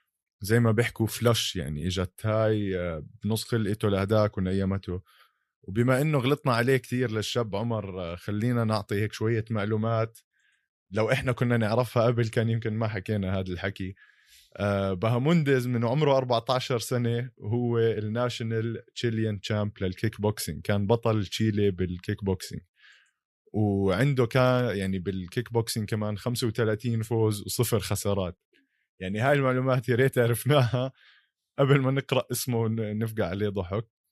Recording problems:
none

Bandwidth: 15 kHz